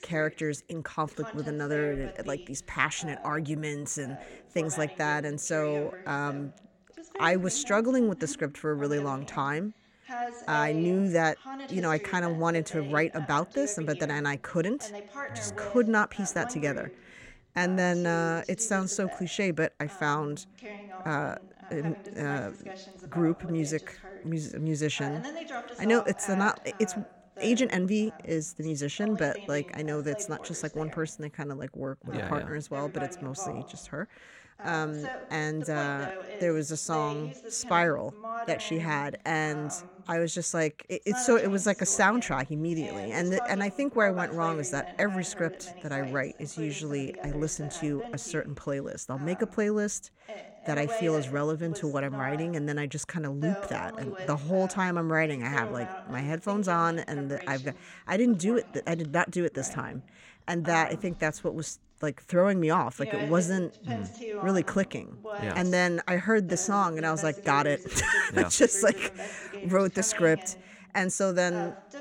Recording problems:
voice in the background; noticeable; throughout; 15 dB below the speech

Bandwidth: 16.5 kHz